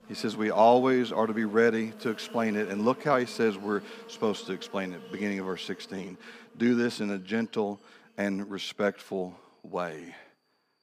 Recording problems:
animal sounds; noticeable; throughout; 20 dB below the speech

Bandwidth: 15 kHz